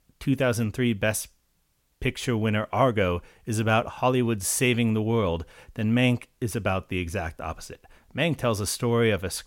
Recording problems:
none

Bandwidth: 16.5 kHz